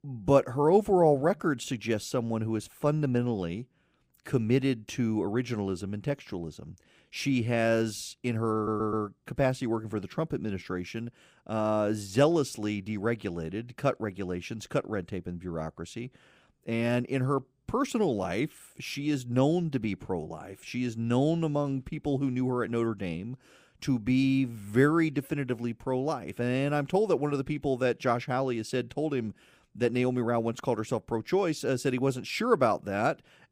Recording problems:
audio stuttering; at 8.5 s

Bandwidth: 15.5 kHz